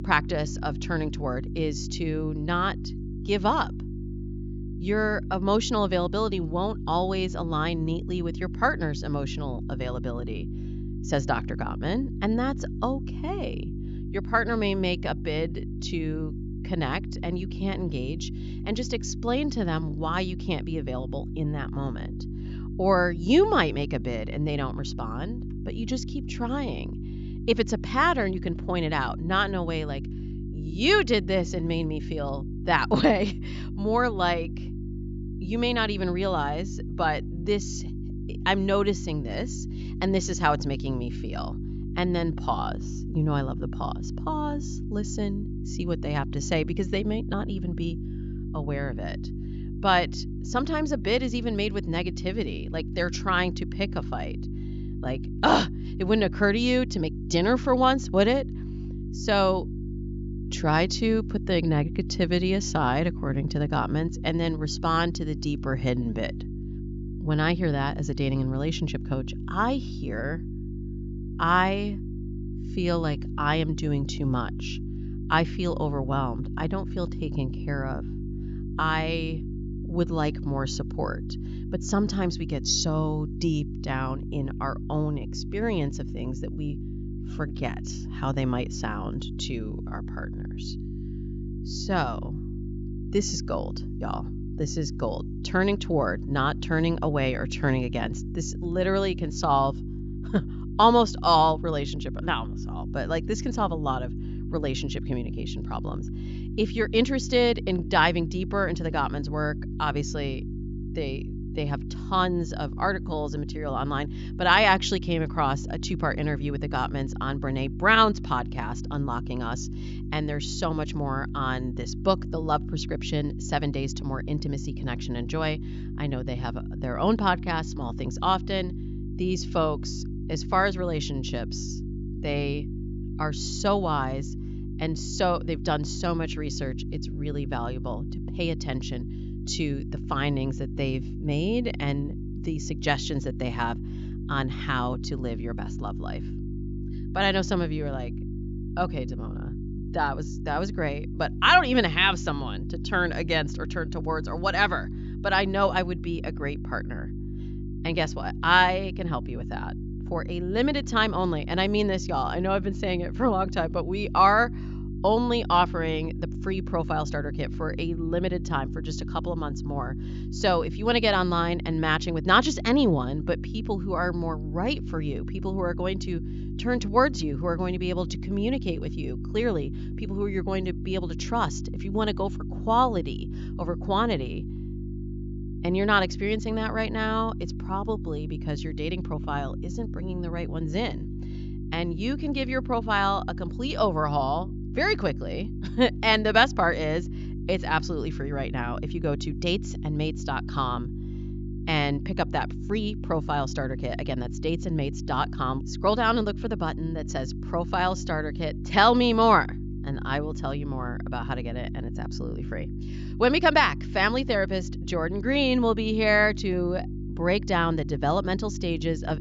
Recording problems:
high frequencies cut off; noticeable; nothing above 7.5 kHz
electrical hum; noticeable; throughout; 50 Hz, 15 dB below the speech

